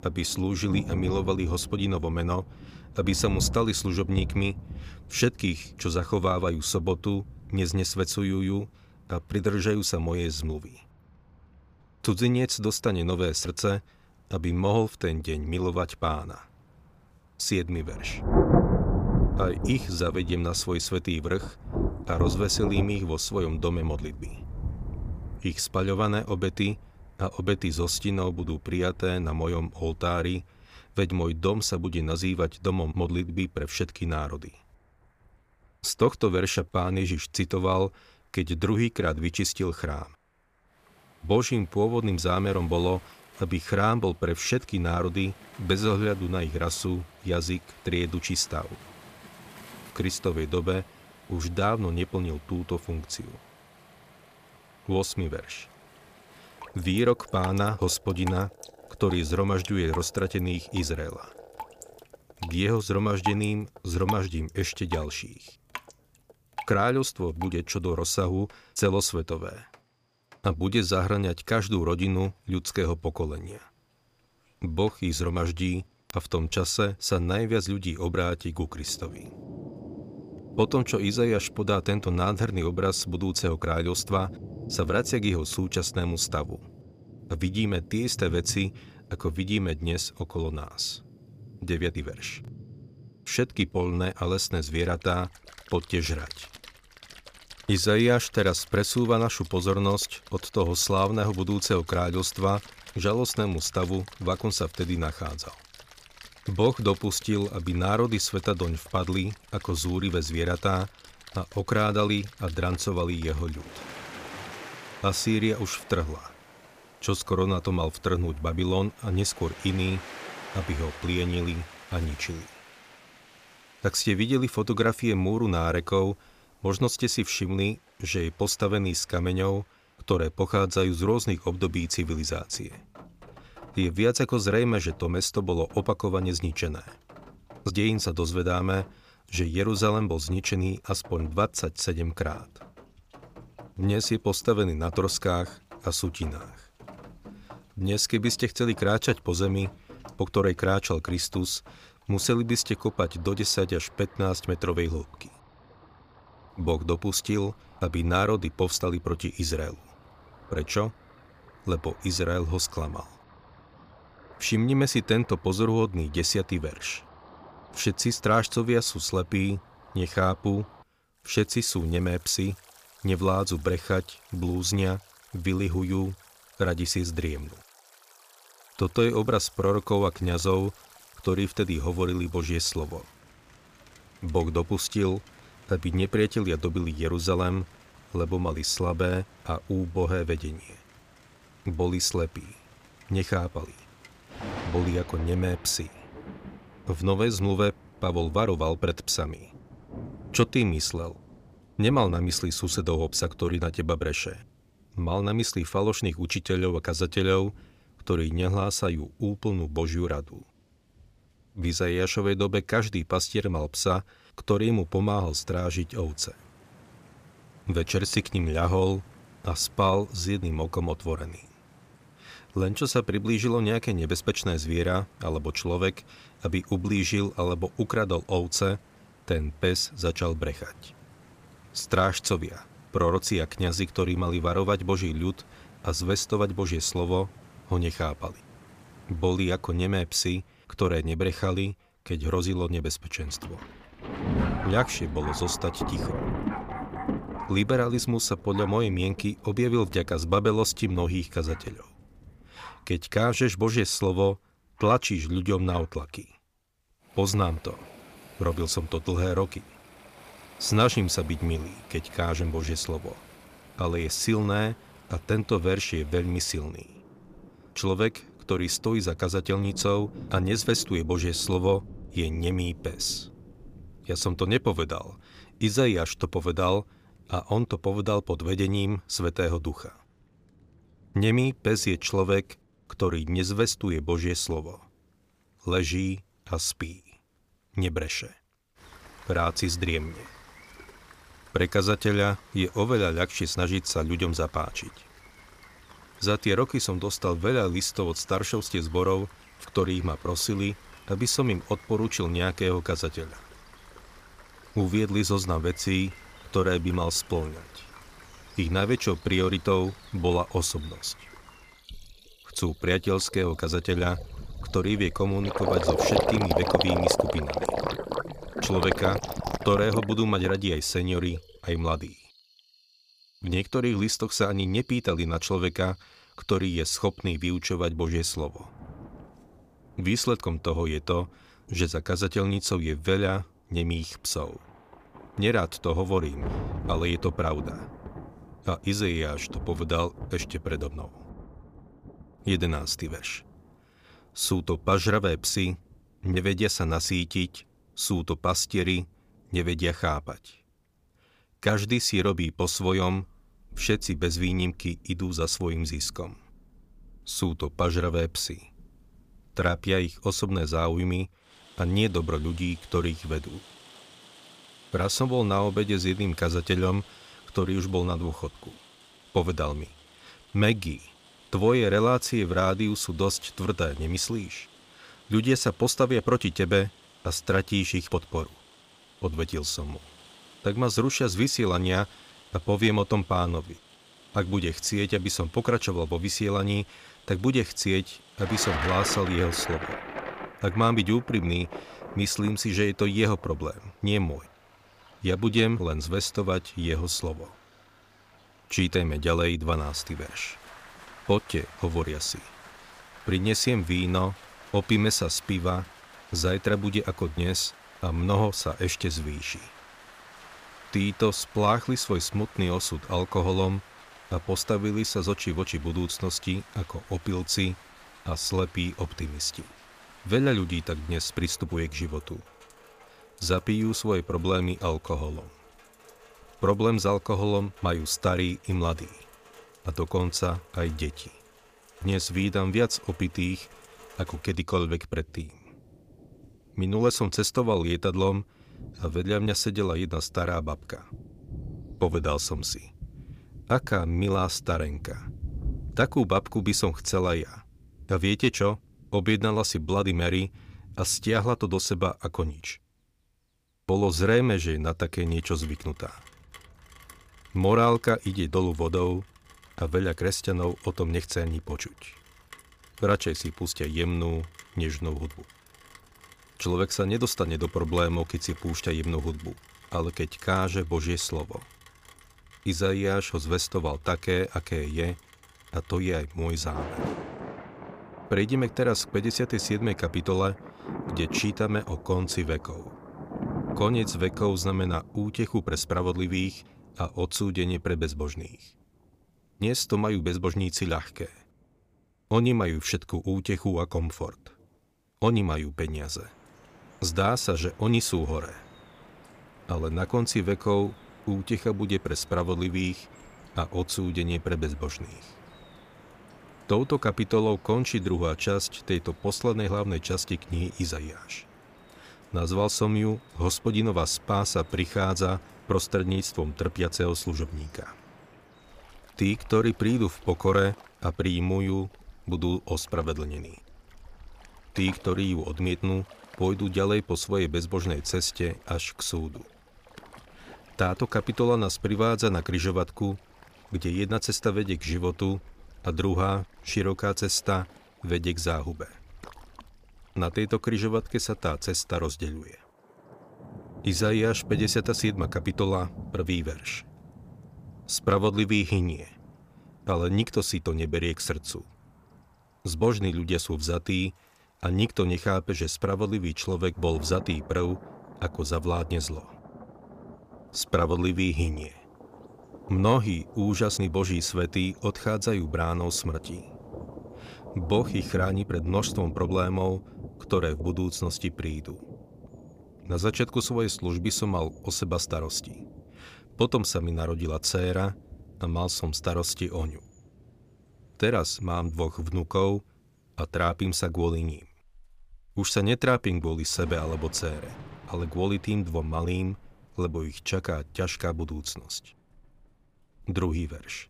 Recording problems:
rain or running water; noticeable; throughout; 15 dB below the speech

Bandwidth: 15 kHz